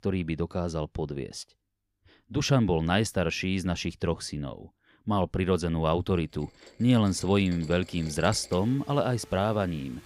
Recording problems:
rain or running water; faint; from 6.5 s on; 20 dB below the speech

